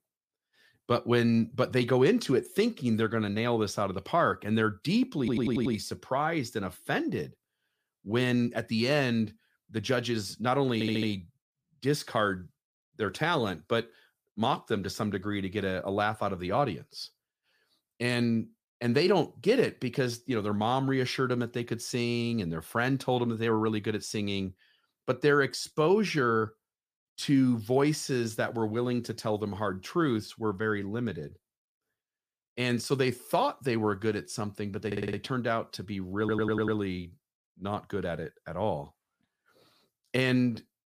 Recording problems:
audio stuttering; 4 times, first at 5 s

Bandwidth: 15 kHz